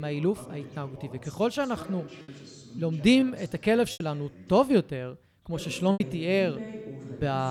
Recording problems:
voice in the background; noticeable; throughout; 15 dB below the speech
choppy; occasionally; 3% of the speech affected
abrupt cut into speech; at the start and the end

